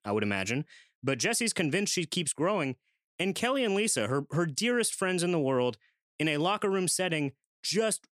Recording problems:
none

